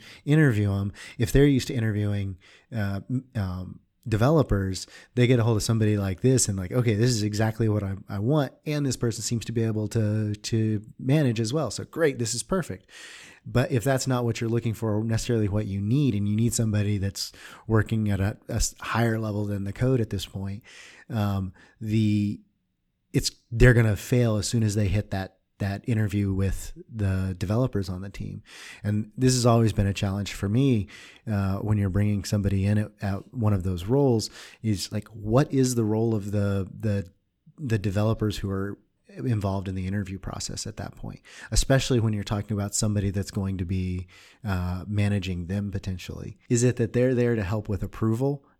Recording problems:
none

